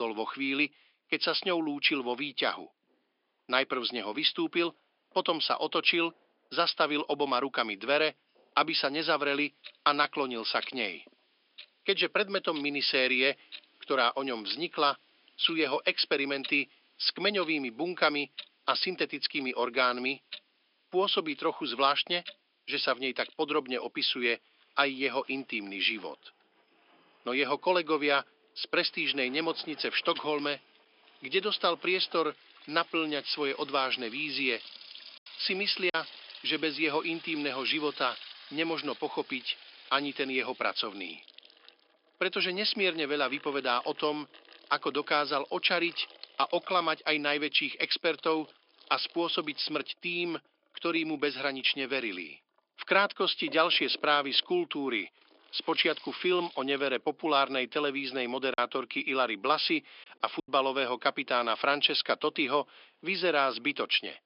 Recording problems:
thin; somewhat; fading below 250 Hz
high frequencies cut off; noticeable; nothing above 5.5 kHz
household noises; noticeable; throughout; 20 dB below the speech
abrupt cut into speech; at the start
choppy; occasionally; at 36 s and from 59 s to 1:00; 3% of the speech affected

